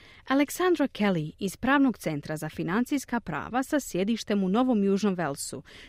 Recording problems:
none

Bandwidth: 15.5 kHz